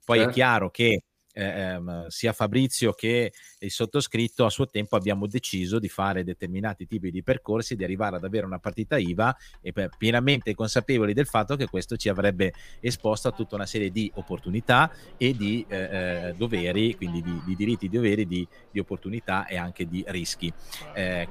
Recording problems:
household noises; faint; throughout; 25 dB below the speech

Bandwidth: 15 kHz